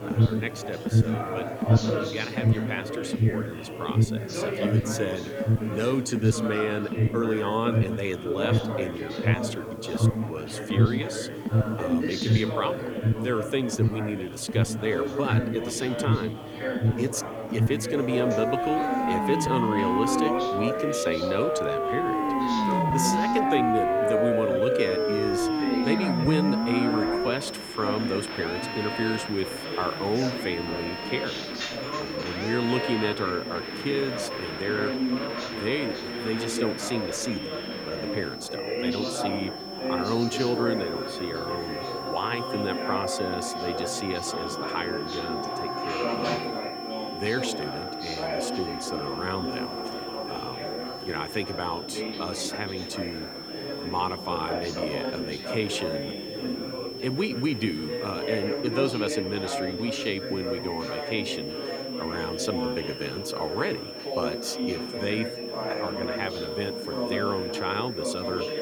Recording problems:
alarms or sirens; very loud; throughout; 1 dB above the speech
high-pitched whine; loud; from 25 s on; 5.5 kHz, 8 dB below the speech
chatter from many people; loud; throughout; 3 dB below the speech
electrical hum; faint; from 12 to 42 s and from 49 s to 1:01; 50 Hz, 30 dB below the speech
hiss; faint; throughout; 25 dB below the speech

